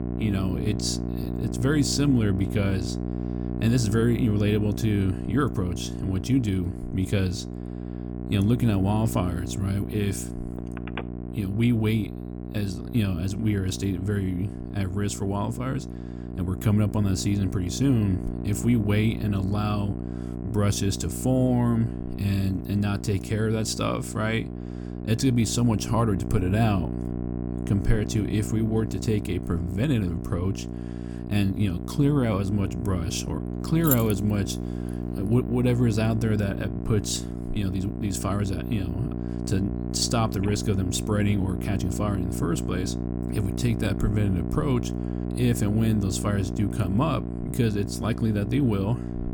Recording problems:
electrical hum; loud; throughout; 60 Hz, 8 dB below the speech
phone ringing; faint; at 11 s; peak 15 dB below the speech
jangling keys; noticeable; at 34 s; peak 1 dB below the speech

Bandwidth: 18 kHz